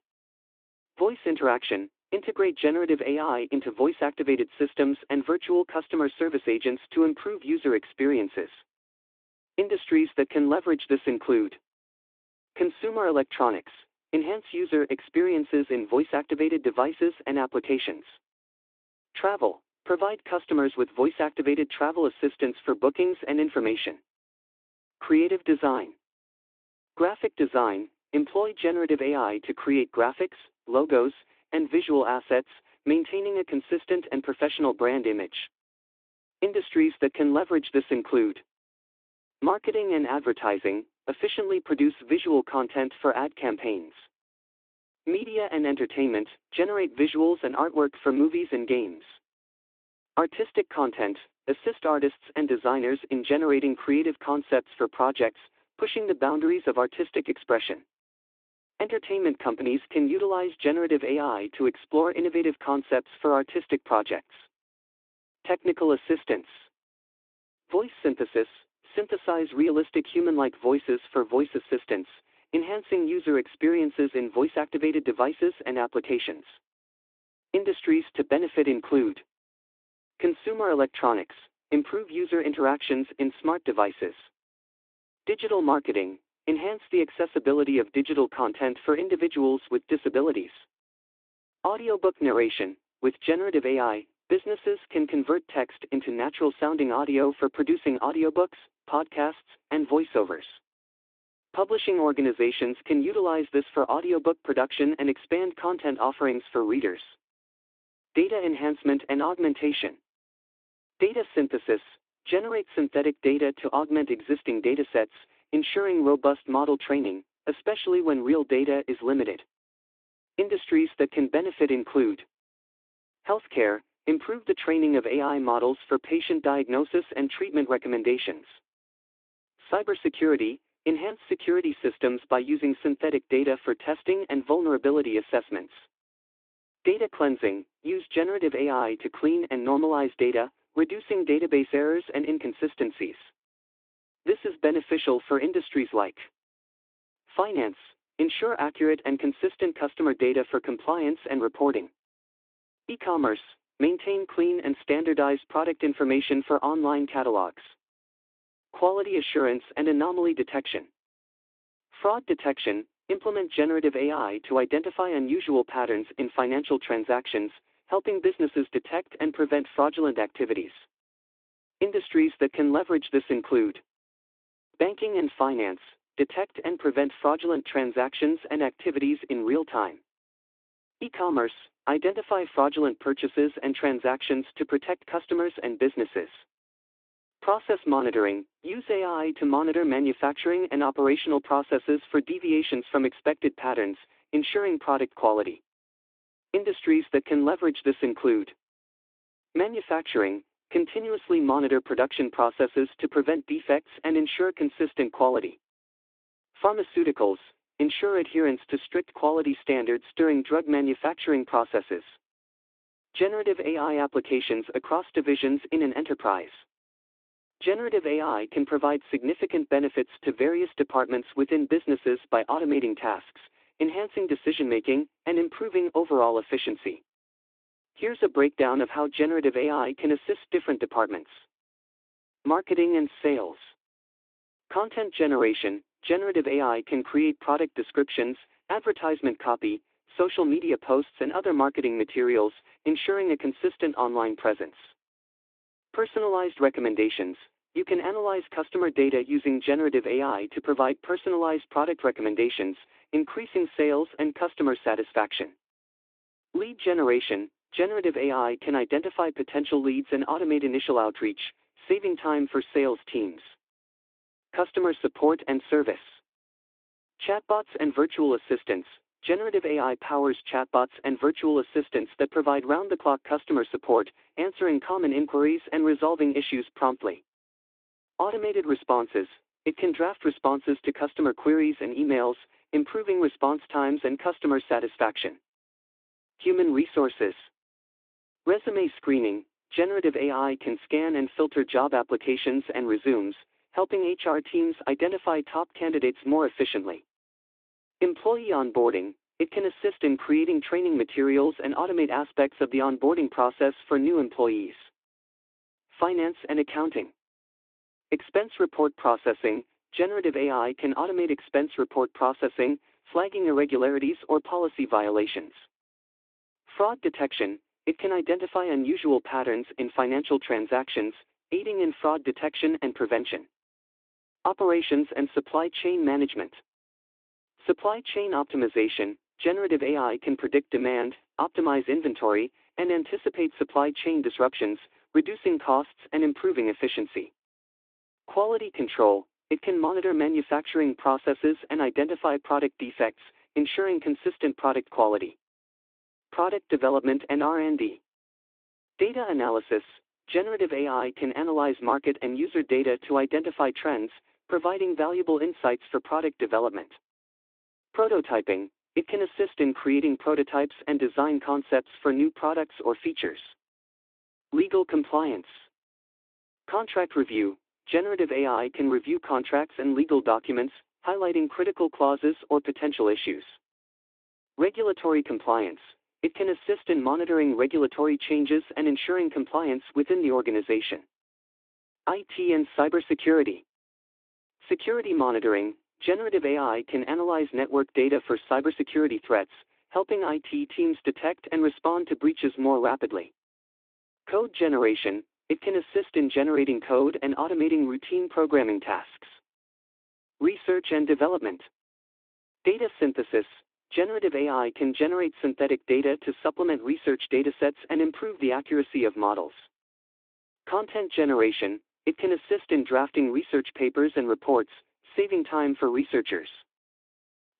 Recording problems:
phone-call audio

